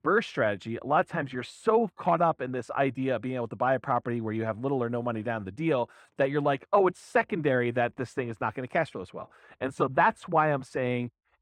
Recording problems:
muffled; very; fading above 3.5 kHz

